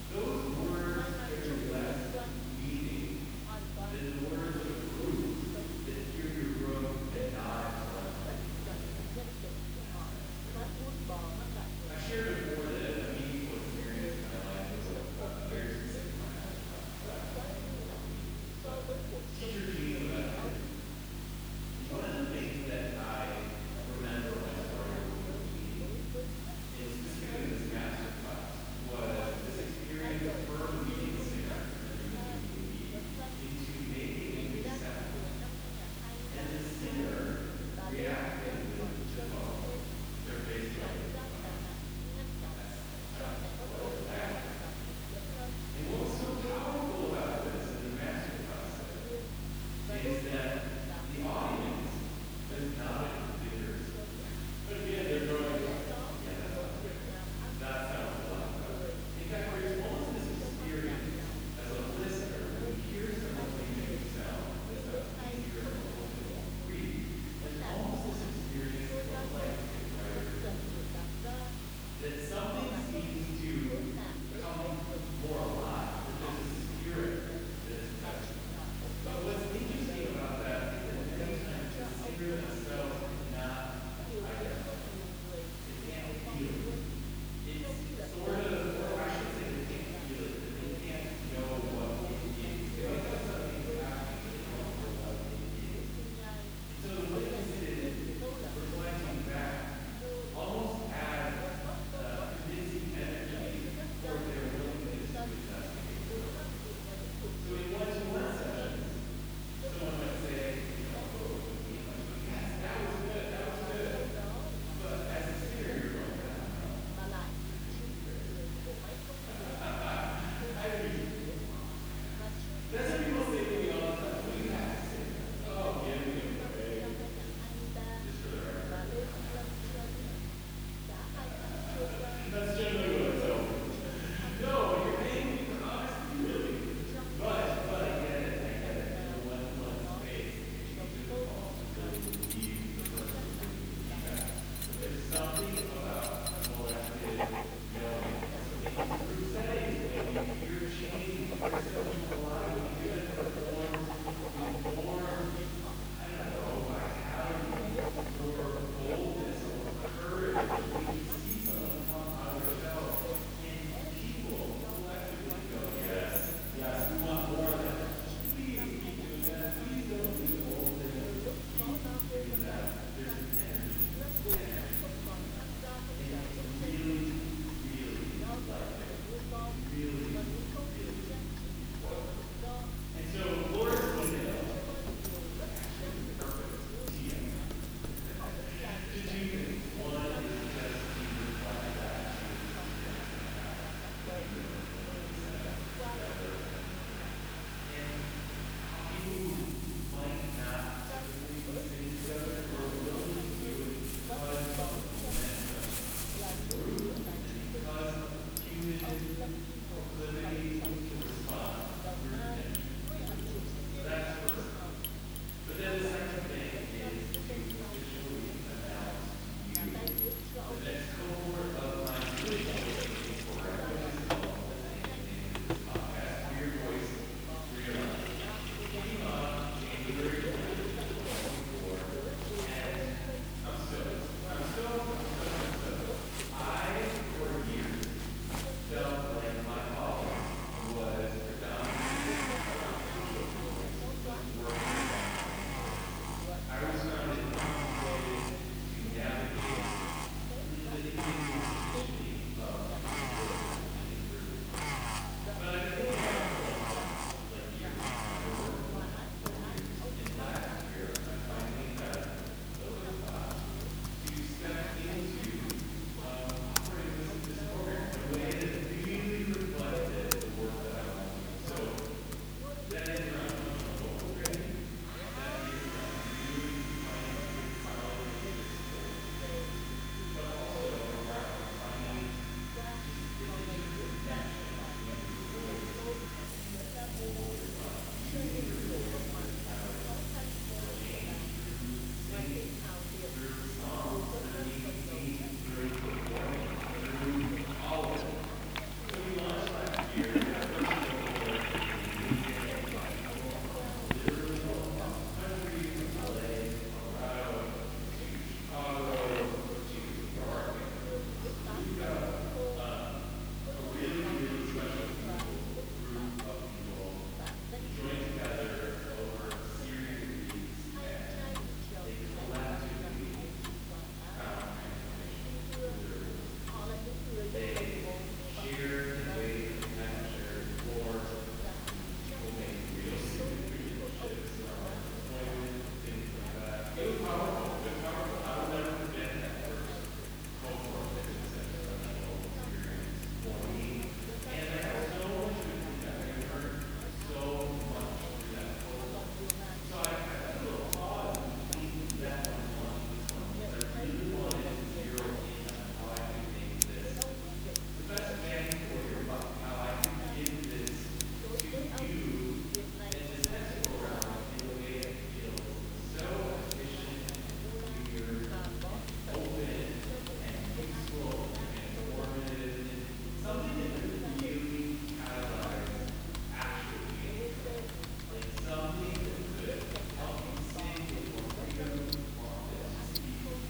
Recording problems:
room echo; strong; dies away in 2.1 s
off-mic speech; far
household noises; loud; from 2:22 on; 1 dB below the speech
voice in the background; loud; throughout; 8 dB below the speech
hiss; loud; throughout; 6 dB below the speech
electrical hum; noticeable; throughout; 50 Hz, 15 dB below the speech

